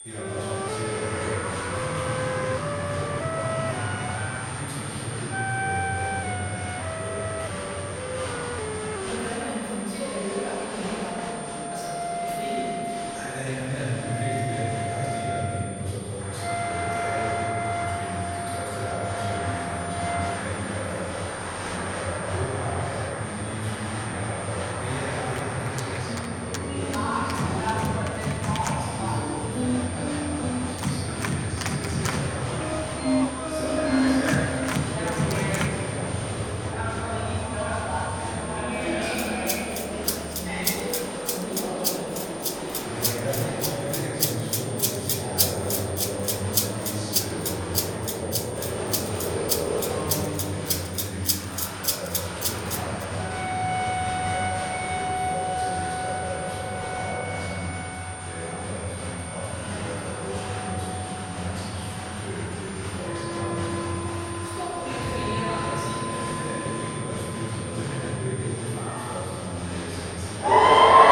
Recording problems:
room echo; strong; dies away in 2.9 s
off-mic speech; far
crowd noise; very loud; throughout; 1 dB above the speech
background music; very loud; throughout; 3 dB above the speech
high-pitched whine; loud; throughout; 9 kHz, 7 dB below the speech
chatter from many people; faint; throughout; 25 dB below the speech

